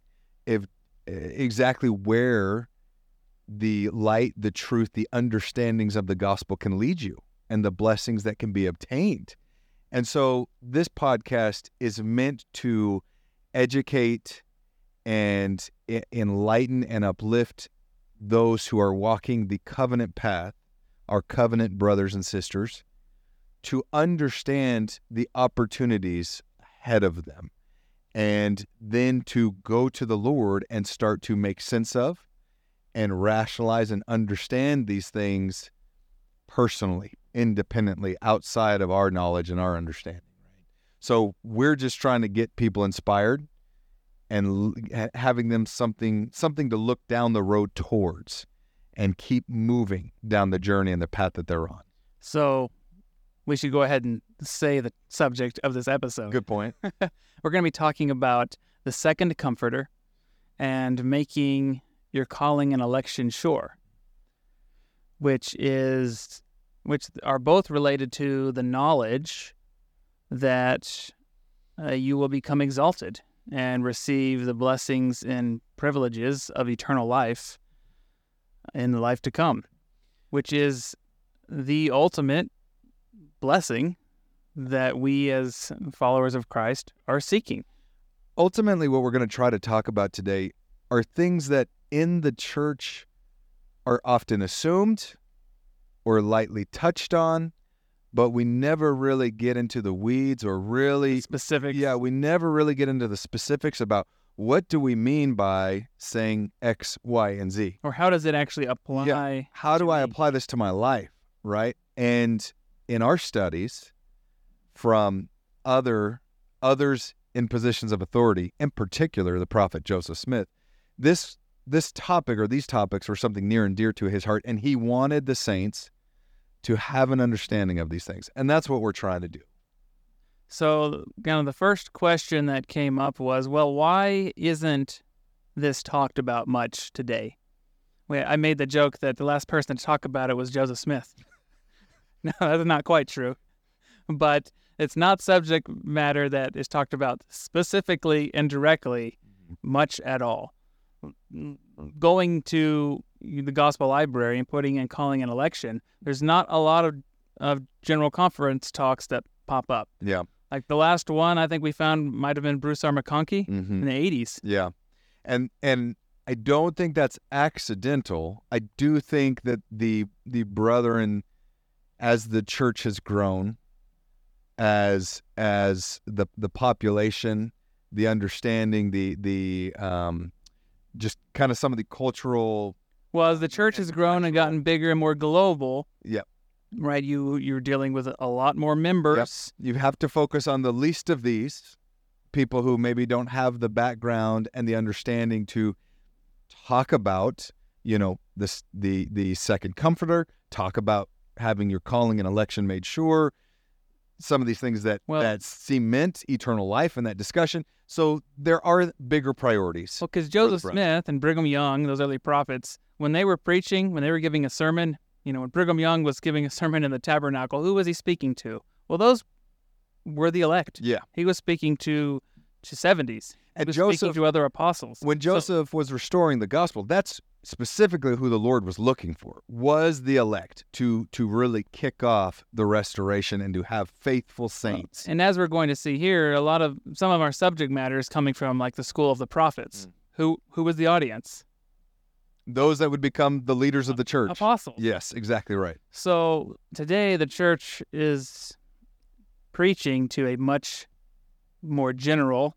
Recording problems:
none

